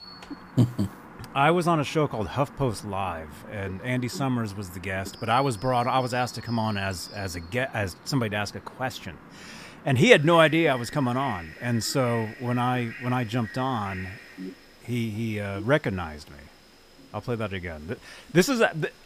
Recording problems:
animal sounds; noticeable; throughout; 20 dB below the speech

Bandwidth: 15 kHz